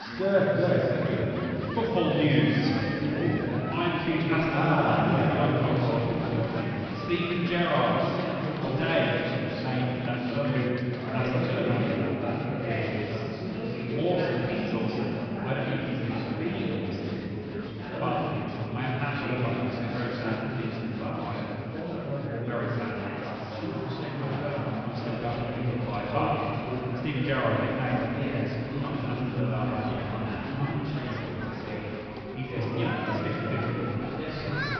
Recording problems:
room echo; strong; dies away in 3 s
off-mic speech; far
high frequencies cut off; noticeable; nothing above 5.5 kHz
chatter from many people; loud; throughout; 3 dB below the speech

